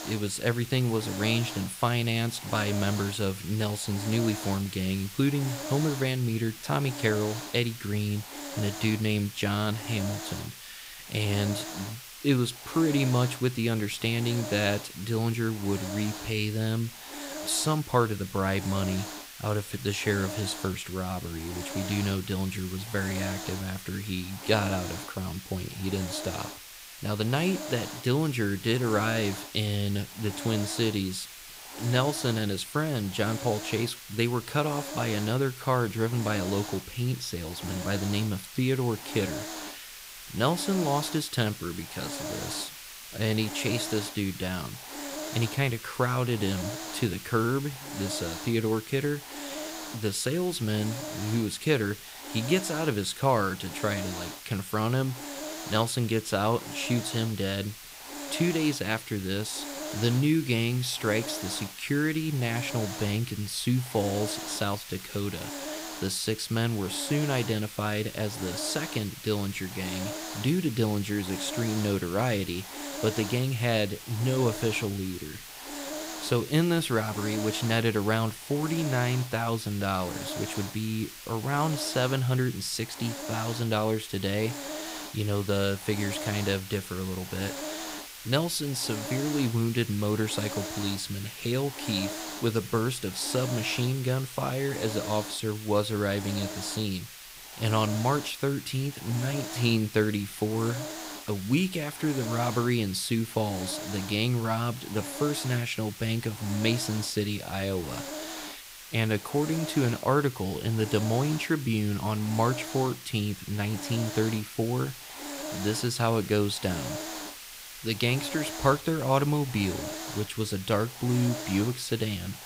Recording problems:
hiss; loud; throughout; 9 dB below the speech

